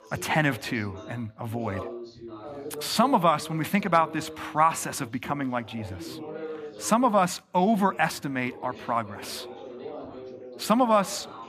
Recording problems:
background chatter; noticeable; throughout; 3 voices, 15 dB below the speech

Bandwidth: 14.5 kHz